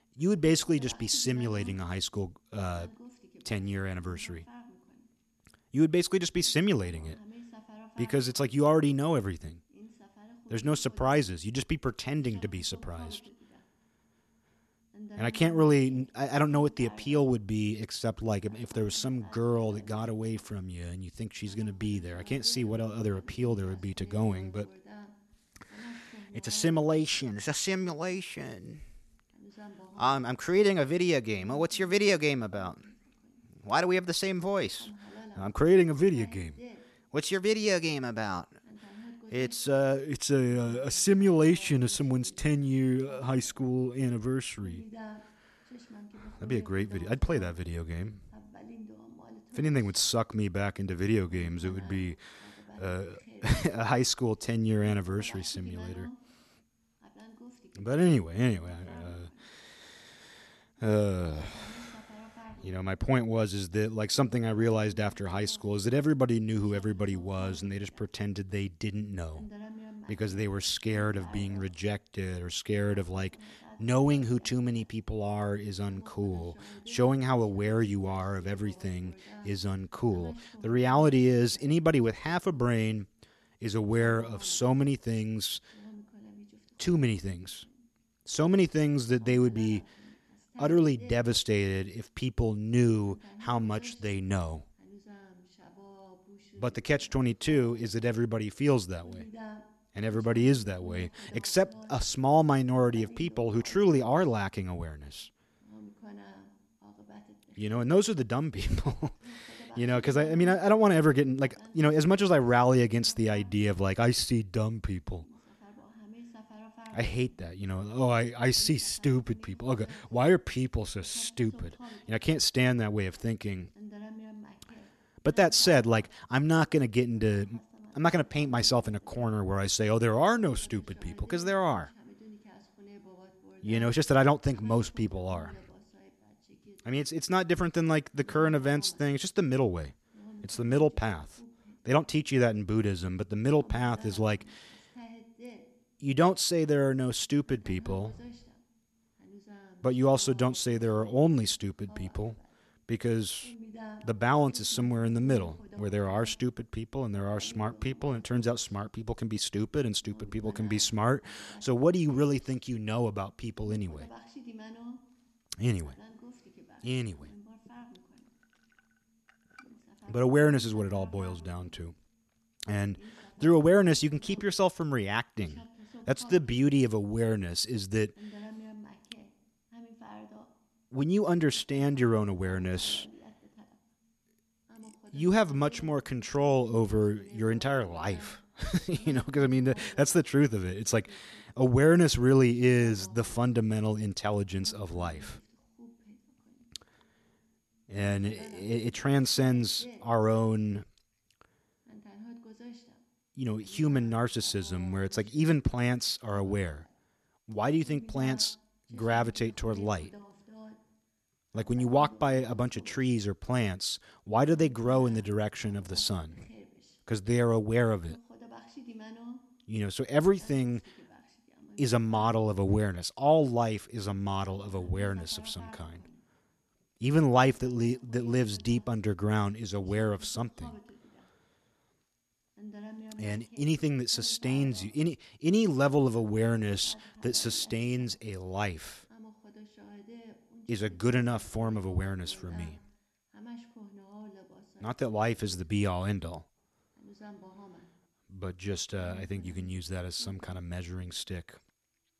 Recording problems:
voice in the background; faint; throughout; 25 dB below the speech

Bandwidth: 13.5 kHz